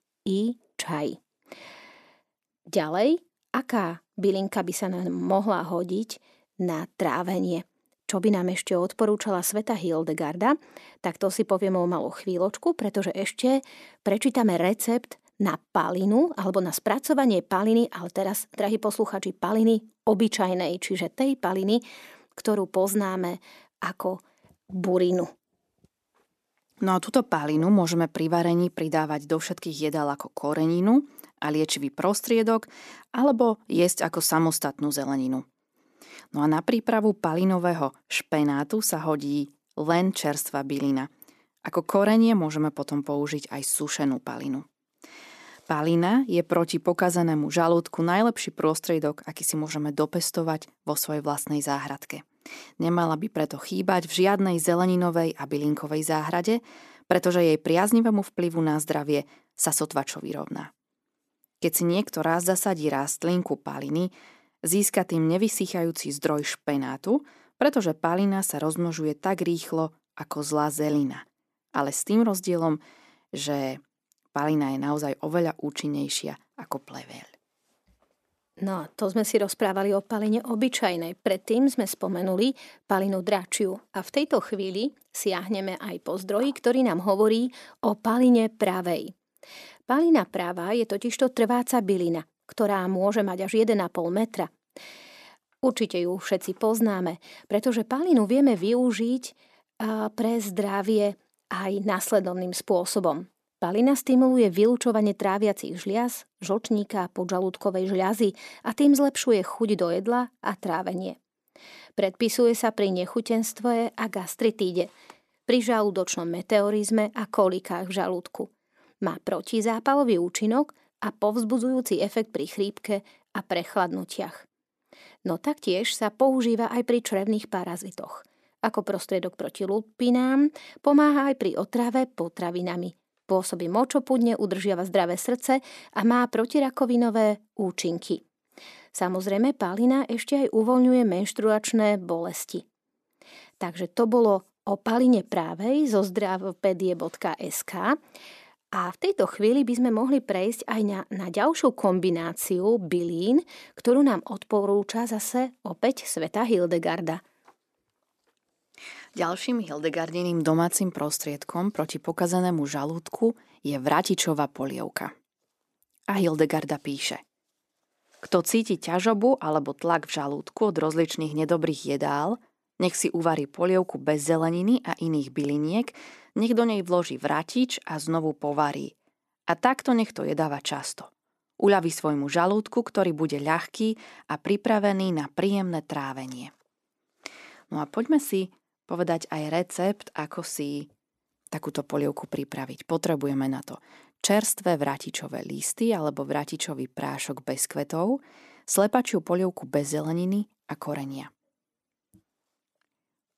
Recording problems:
none

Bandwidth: 14 kHz